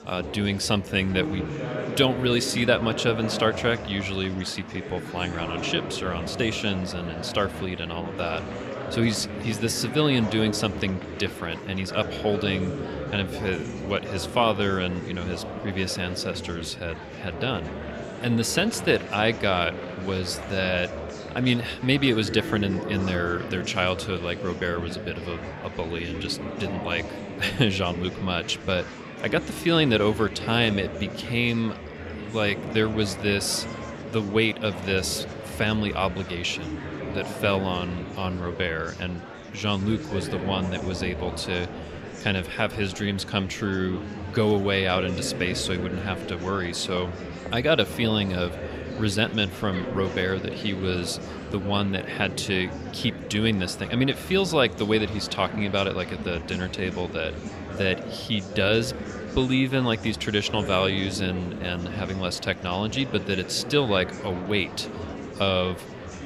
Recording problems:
murmuring crowd; loud; throughout; 8 dB below the speech

